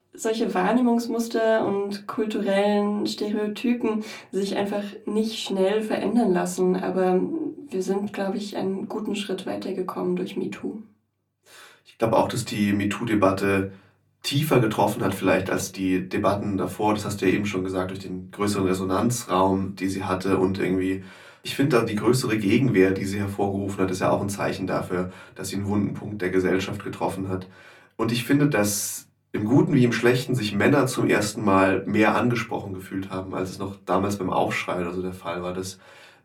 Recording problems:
off-mic speech; far
room echo; very slight; dies away in 0.2 s

